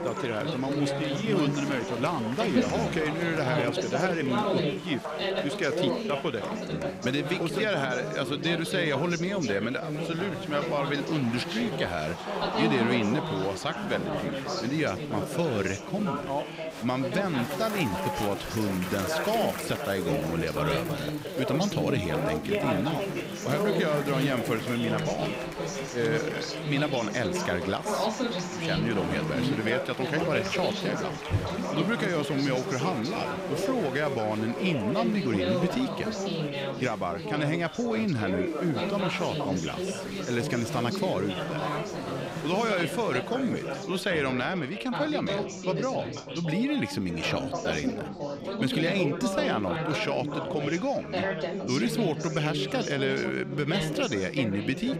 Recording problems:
chatter from many people; loud; throughout; 2 dB below the speech

